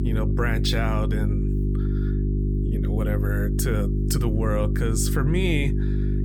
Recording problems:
electrical hum; loud; throughout; 50 Hz, 5 dB below the speech

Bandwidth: 18 kHz